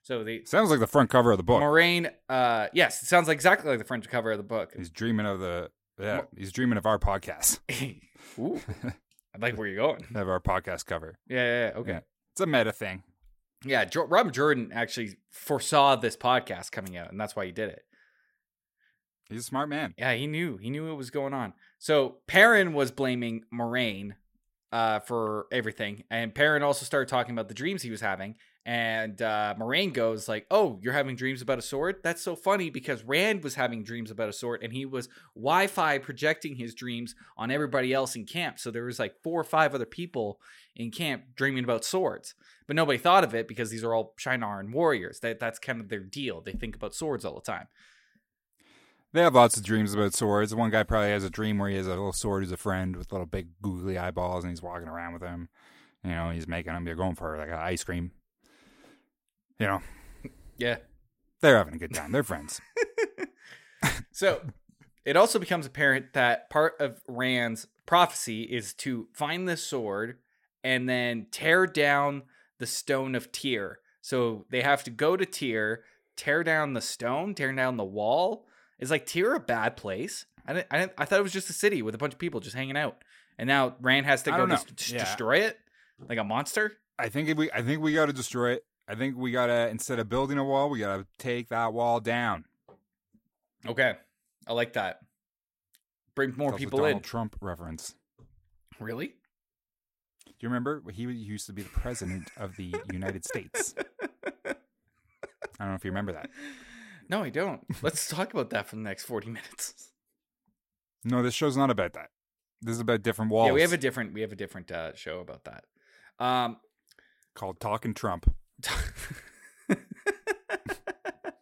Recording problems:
none

